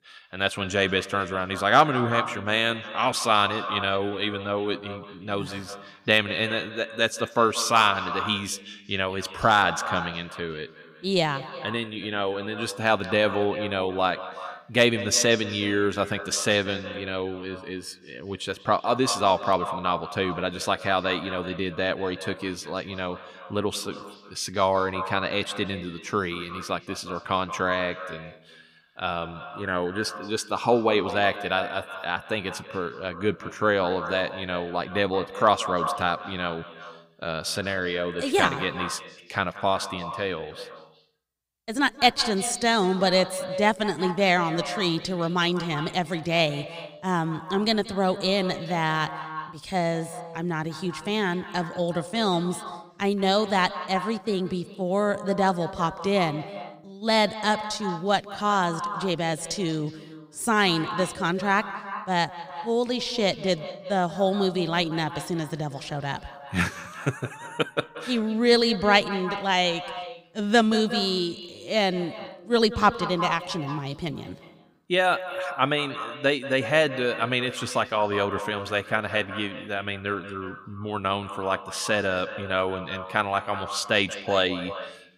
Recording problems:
echo of what is said; strong; throughout; 180 ms later, 10 dB below the speech

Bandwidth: 15.5 kHz